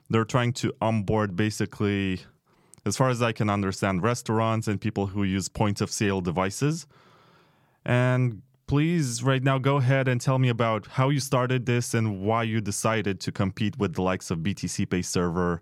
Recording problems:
none

